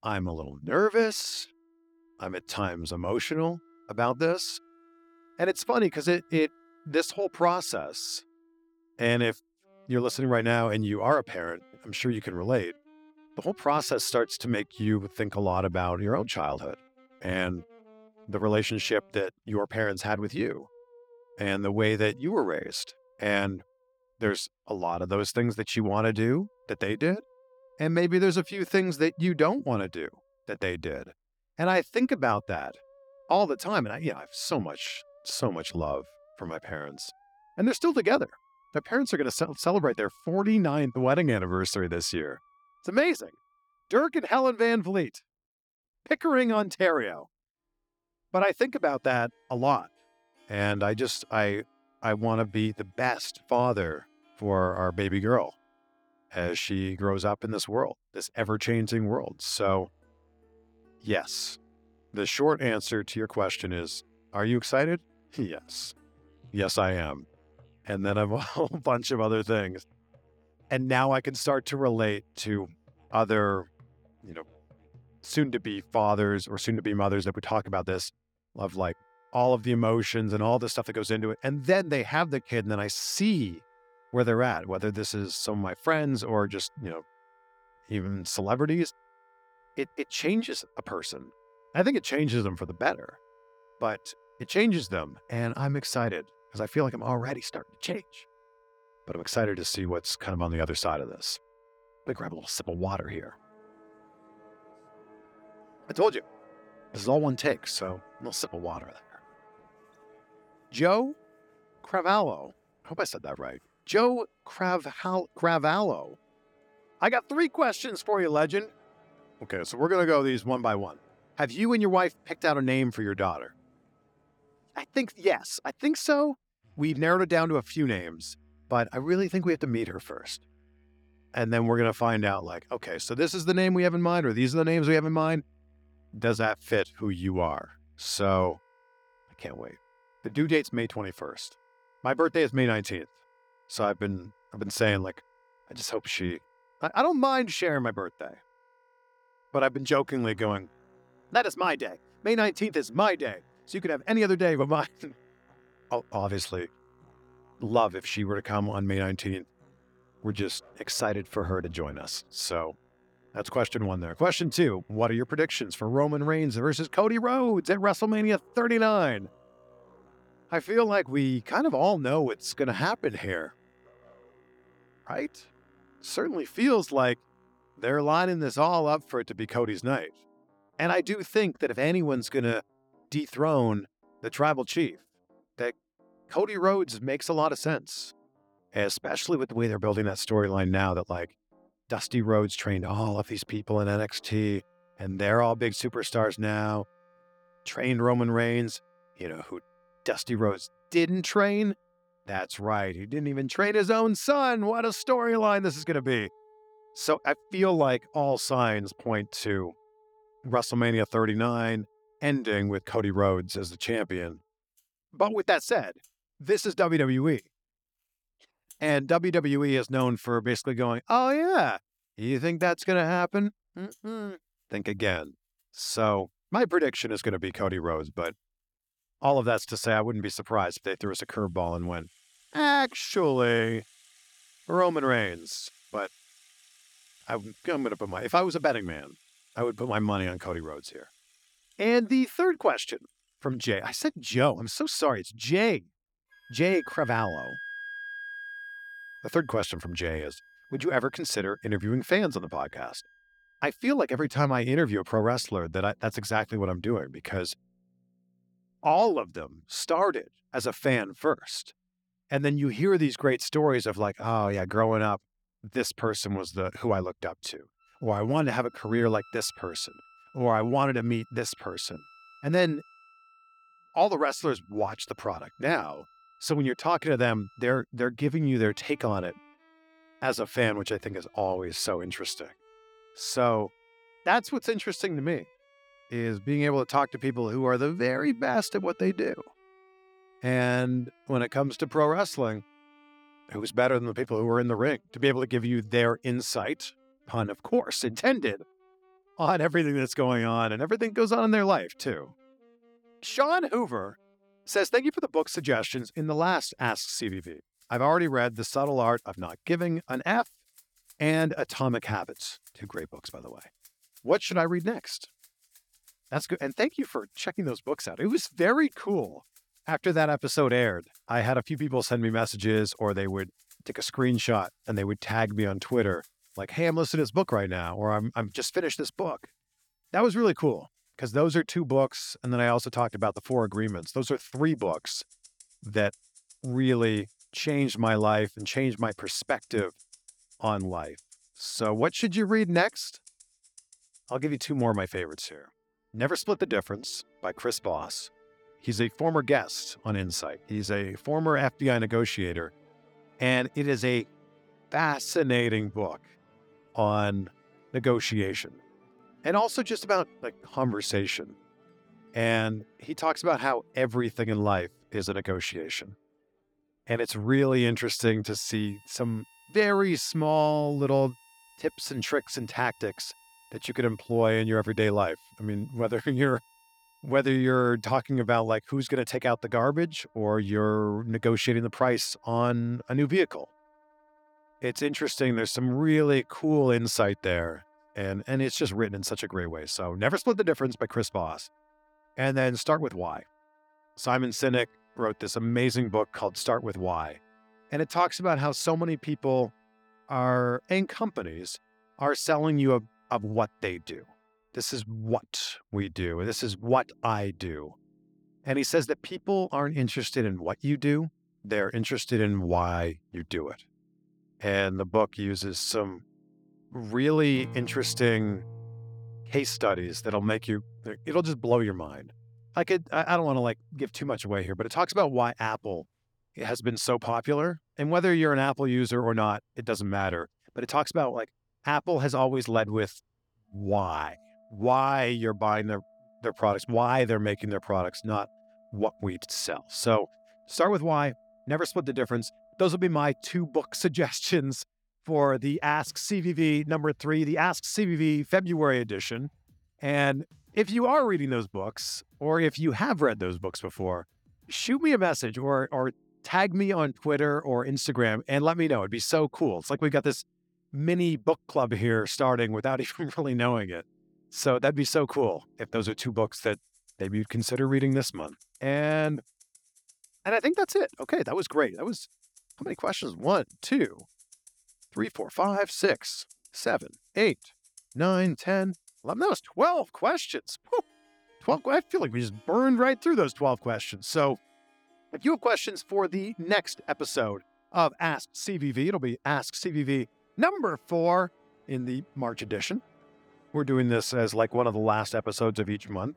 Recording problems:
background music; faint; throughout; 30 dB below the speech

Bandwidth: 18.5 kHz